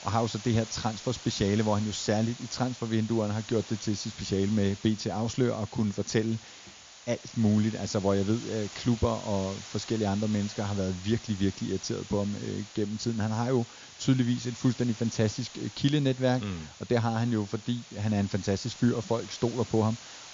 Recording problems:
high frequencies cut off; noticeable; nothing above 7 kHz
hiss; noticeable; throughout; 15 dB below the speech

